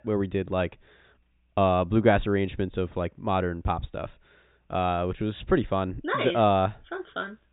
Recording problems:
high frequencies cut off; severe; nothing above 4 kHz

